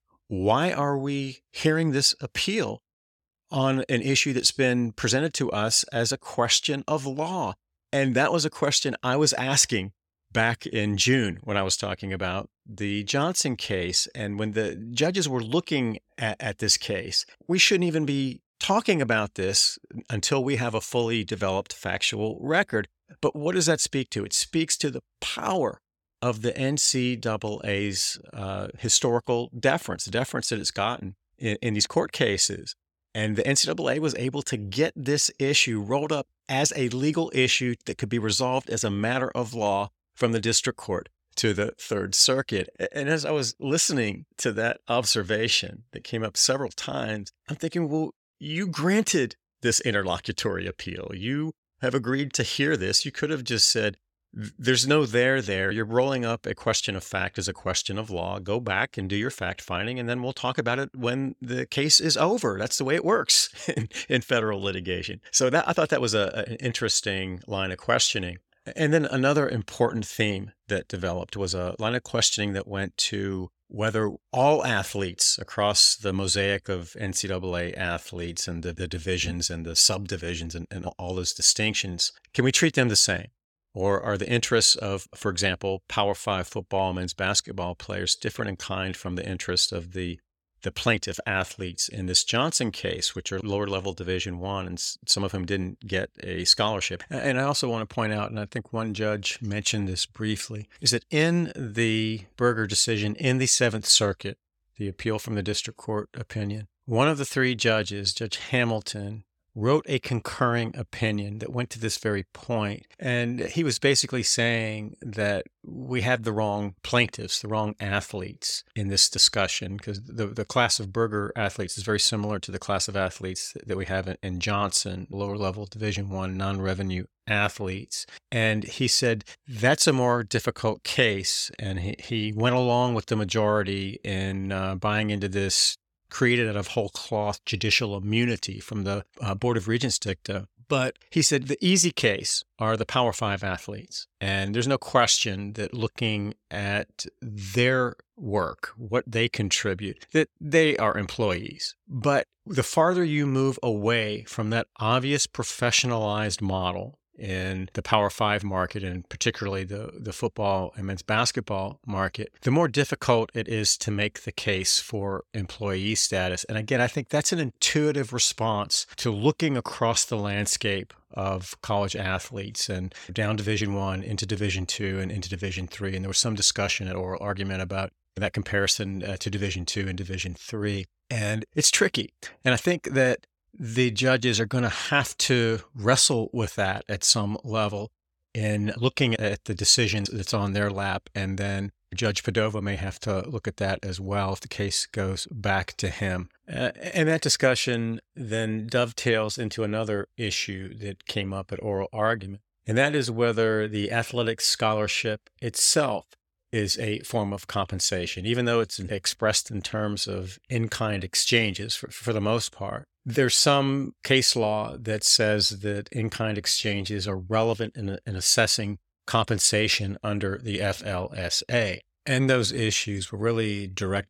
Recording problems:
none

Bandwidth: 17 kHz